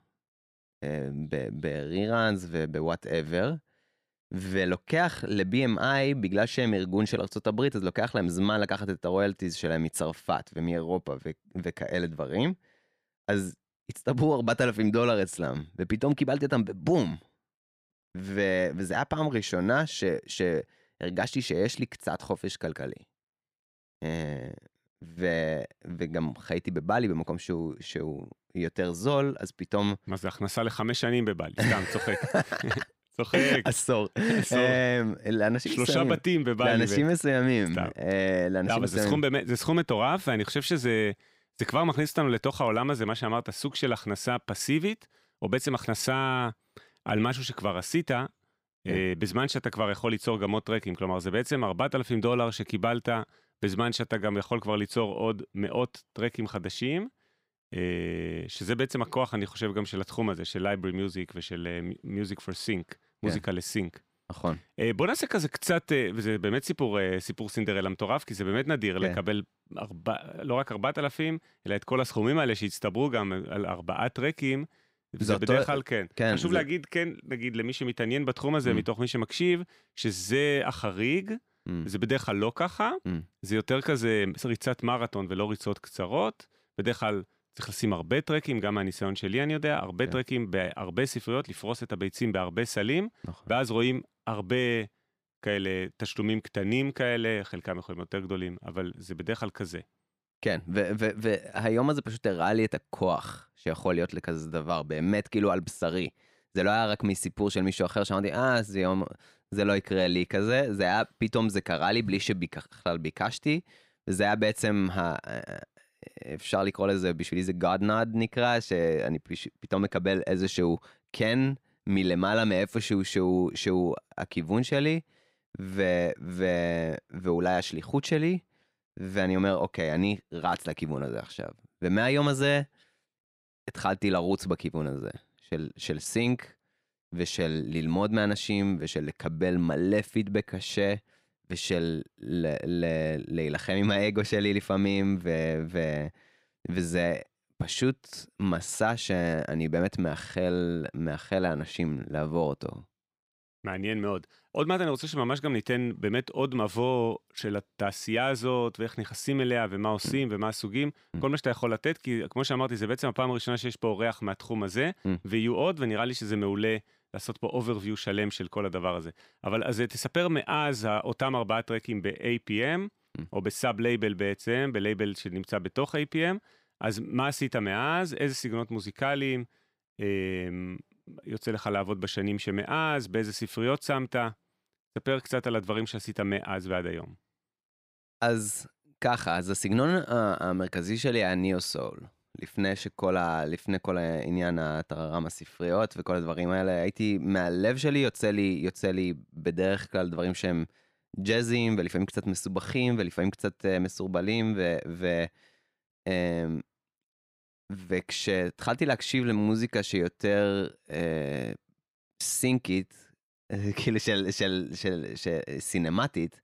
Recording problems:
none

